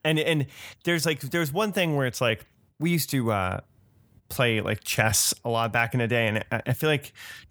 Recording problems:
none

